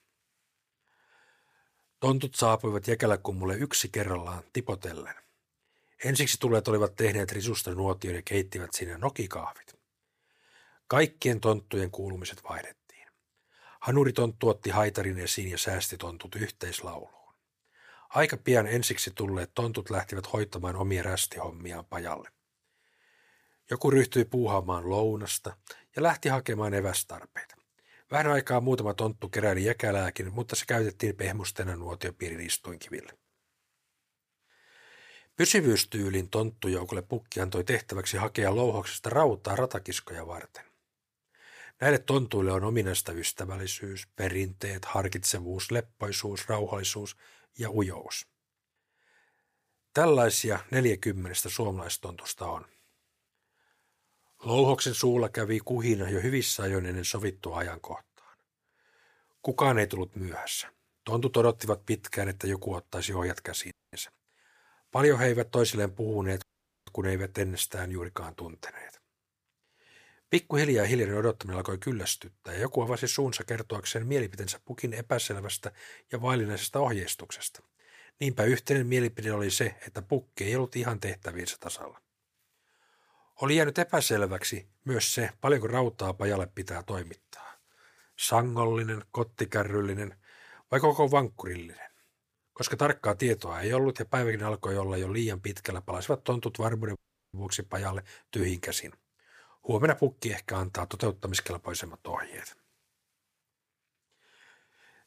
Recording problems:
audio cutting out; at 1:04, at 1:06 and at 1:37

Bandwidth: 15 kHz